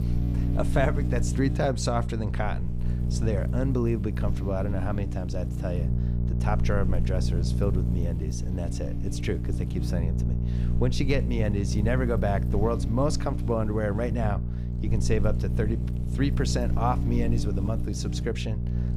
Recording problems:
electrical hum; loud; throughout; 60 Hz, 8 dB below the speech

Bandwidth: 15 kHz